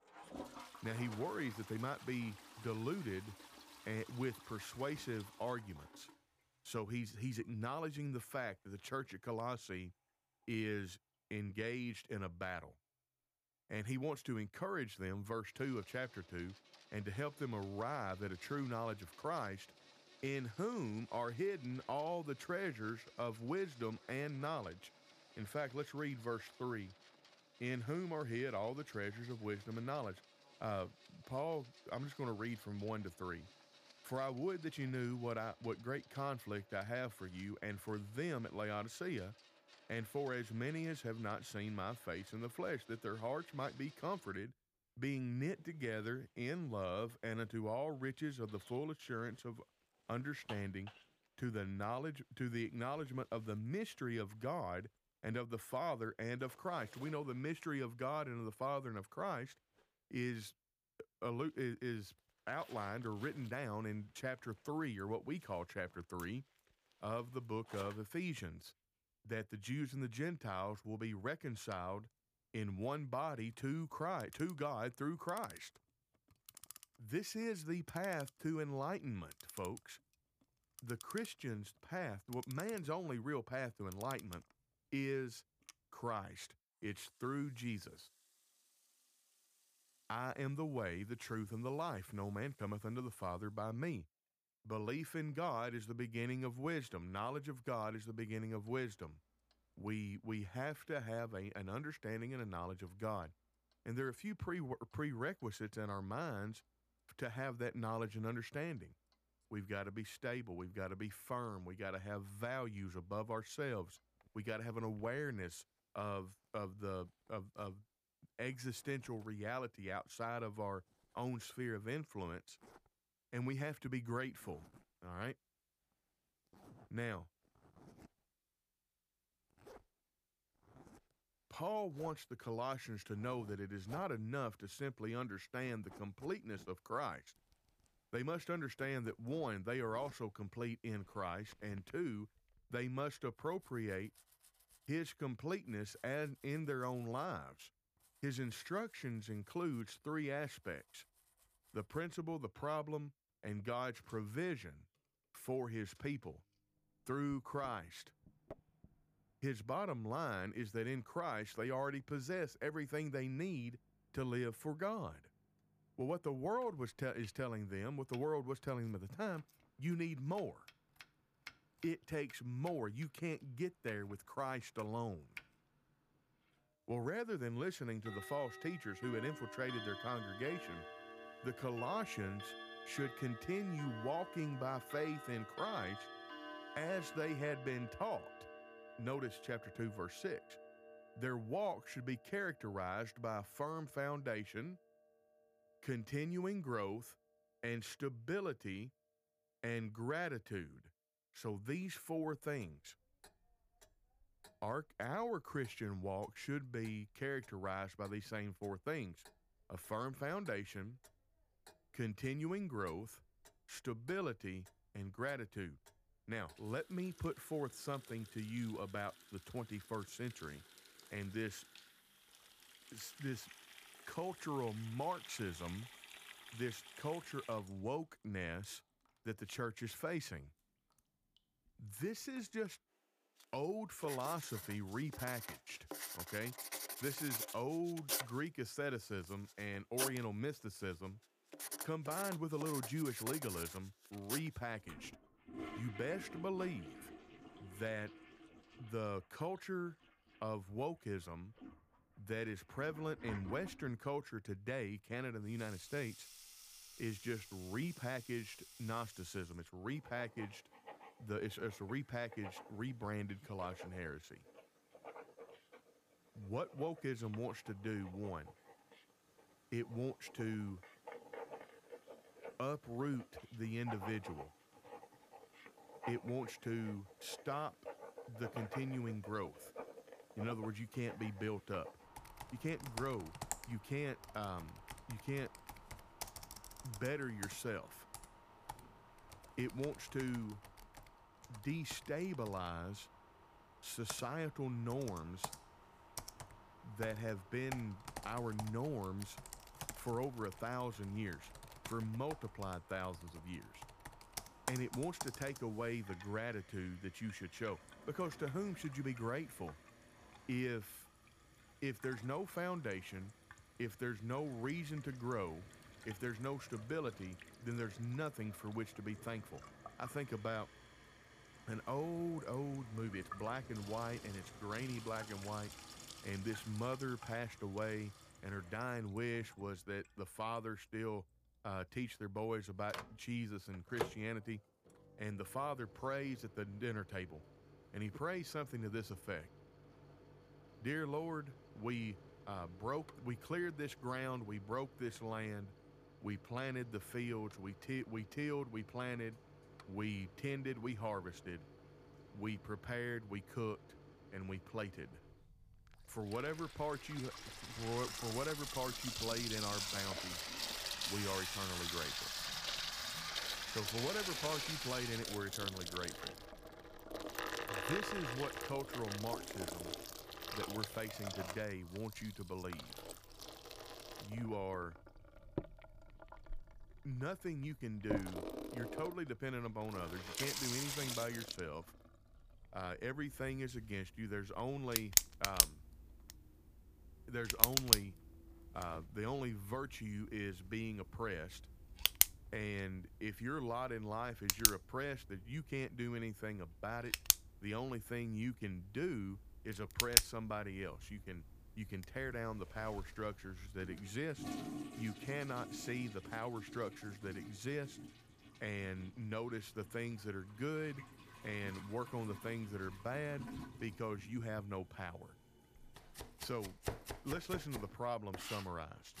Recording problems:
household noises; loud; throughout; 1 dB below the speech

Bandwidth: 15 kHz